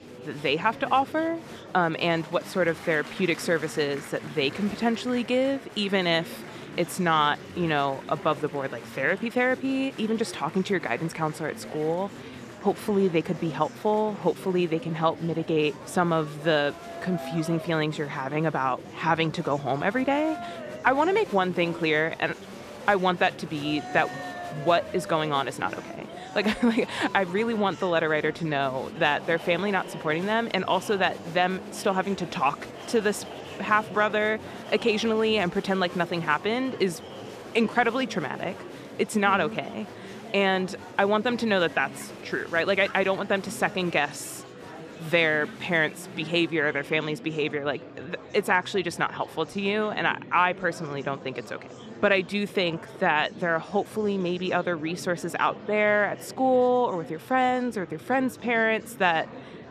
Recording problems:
murmuring crowd; noticeable; throughout; 15 dB below the speech

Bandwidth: 14.5 kHz